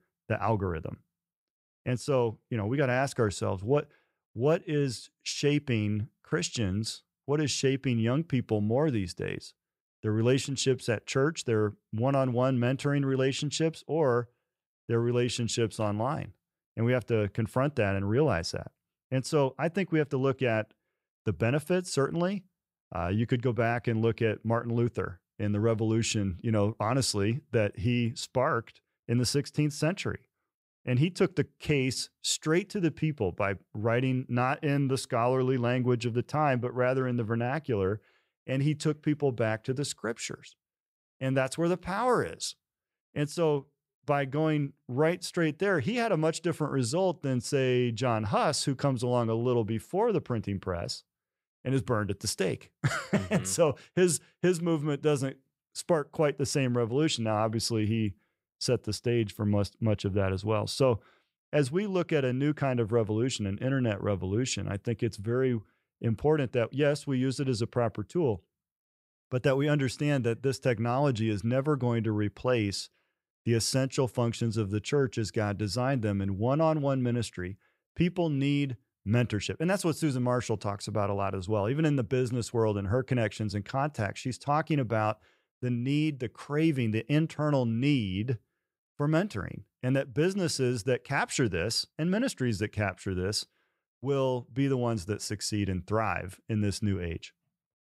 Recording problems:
none

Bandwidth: 15.5 kHz